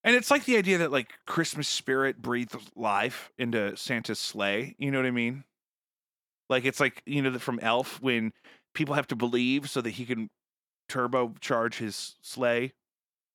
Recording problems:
none

